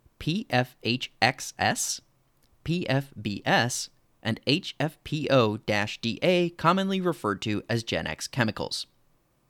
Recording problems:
none

